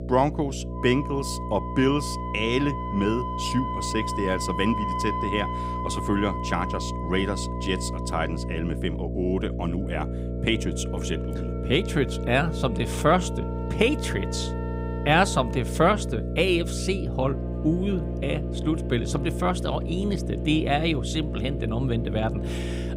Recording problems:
background music; loud; throughout; 9 dB below the speech
electrical hum; noticeable; throughout; 60 Hz, 10 dB below the speech

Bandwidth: 15.5 kHz